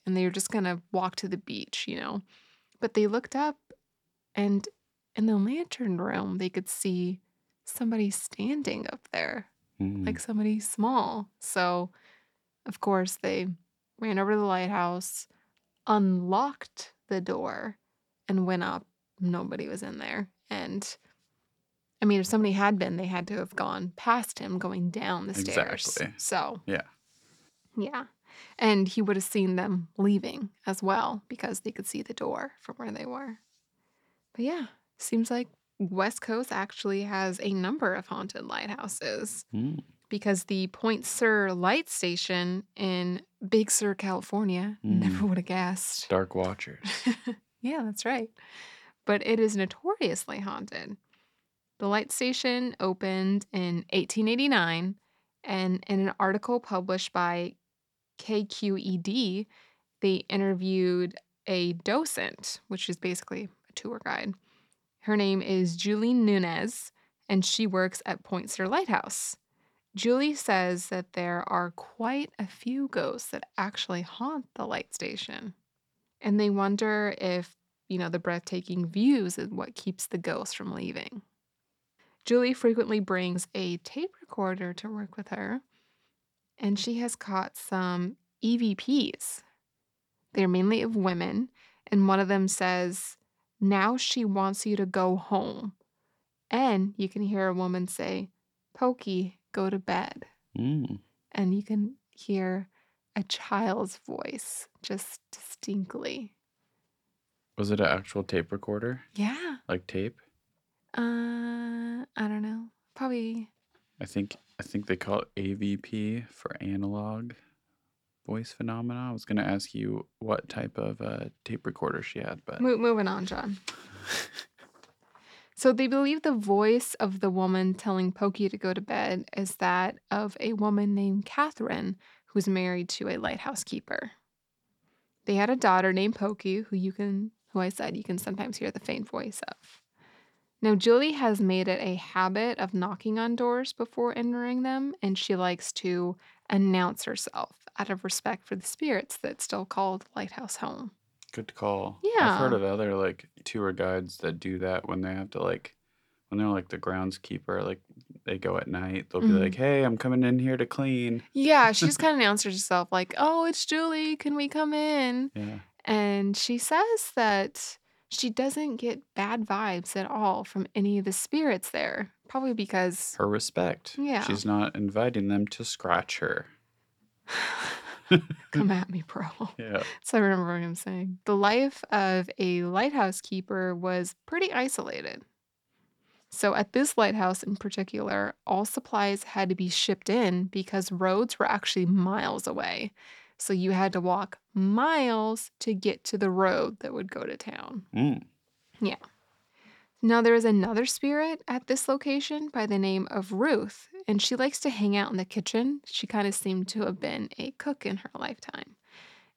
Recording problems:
none

